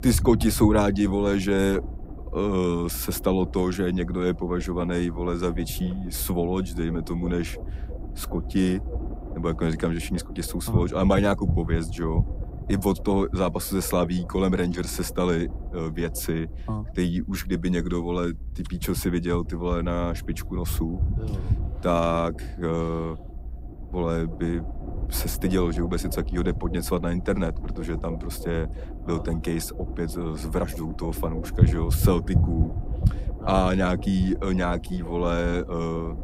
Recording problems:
low rumble; noticeable; throughout; 15 dB below the speech

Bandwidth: 15.5 kHz